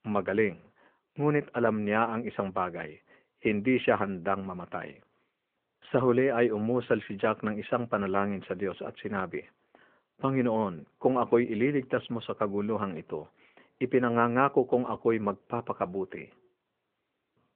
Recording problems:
phone-call audio

